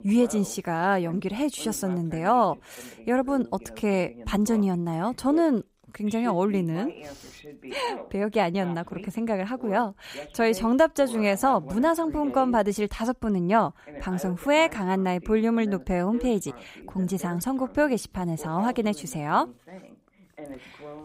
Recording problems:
voice in the background; noticeable; throughout; 20 dB below the speech

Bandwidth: 15.5 kHz